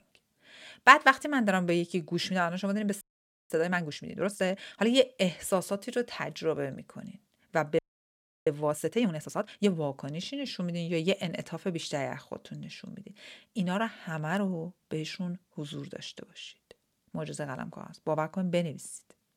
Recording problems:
audio freezing; at 3 s and at 8 s for 0.5 s

